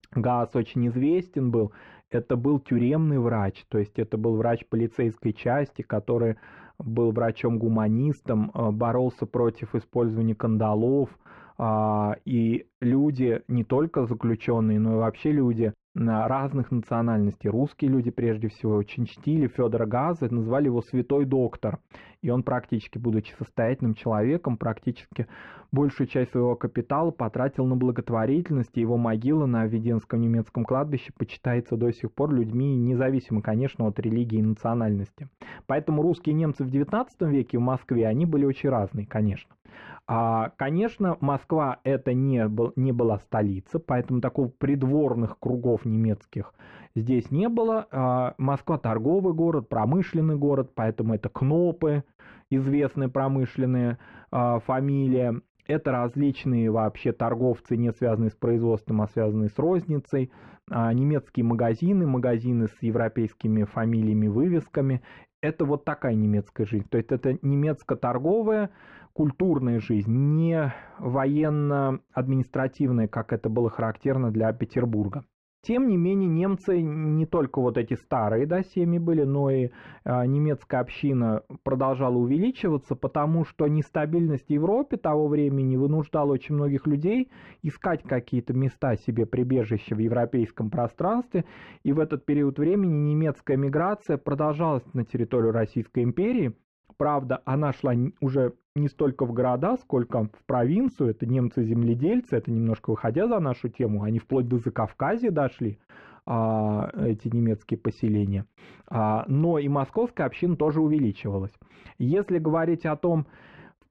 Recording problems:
muffled; very; fading above 1.5 kHz

